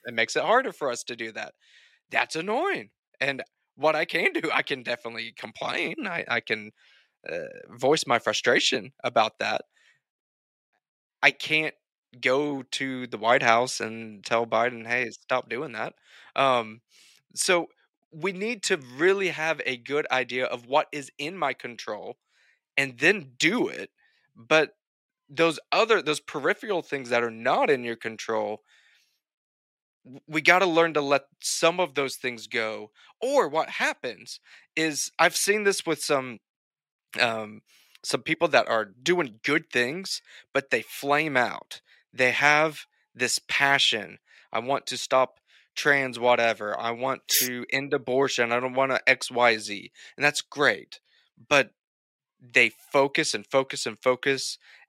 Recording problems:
thin; somewhat; fading below 1 kHz

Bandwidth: 16 kHz